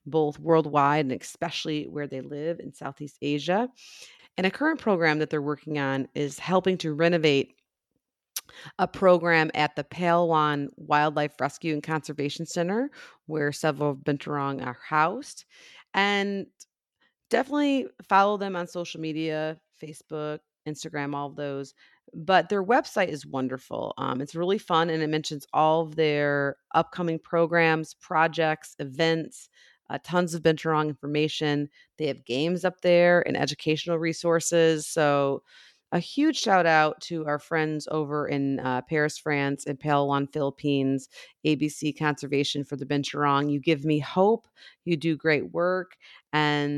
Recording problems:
abrupt cut into speech; at the end

